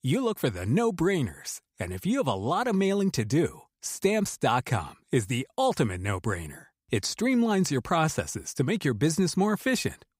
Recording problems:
none

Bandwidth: 15.5 kHz